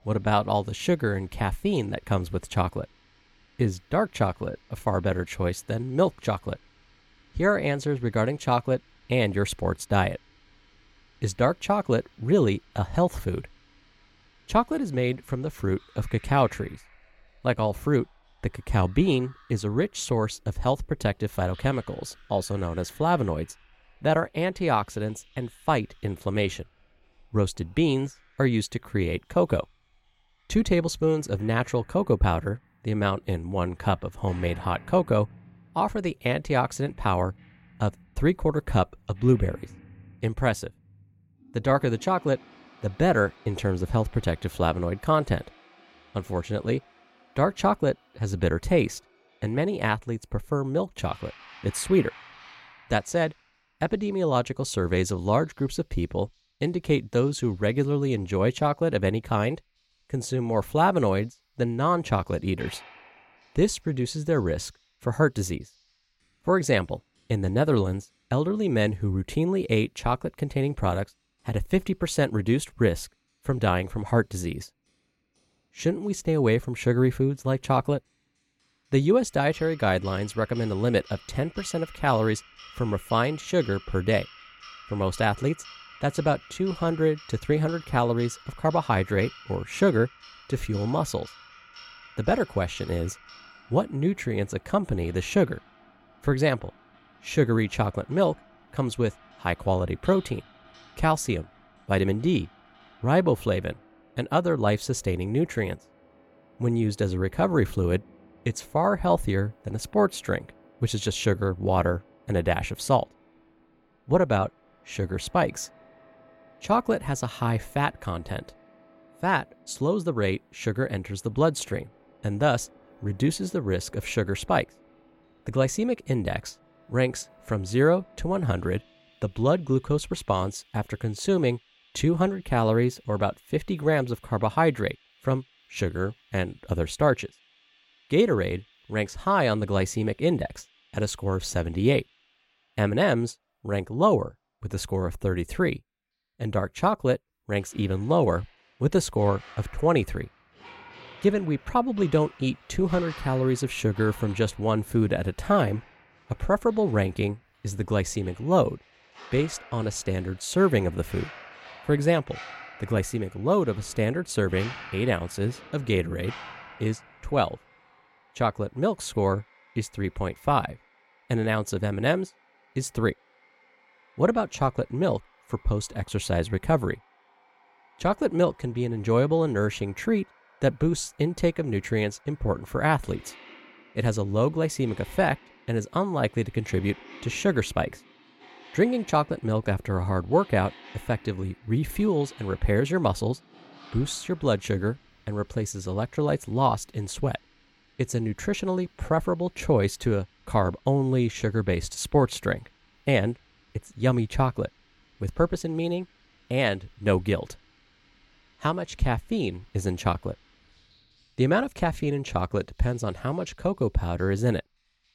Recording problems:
household noises; faint; throughout; 25 dB below the speech

